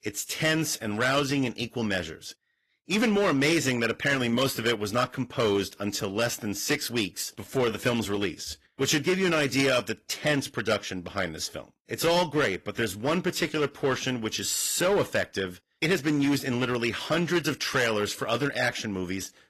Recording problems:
distortion; slight; 6% of the sound clipped
garbled, watery; slightly; nothing above 13.5 kHz
uneven, jittery; slightly; from 6 to 16 s

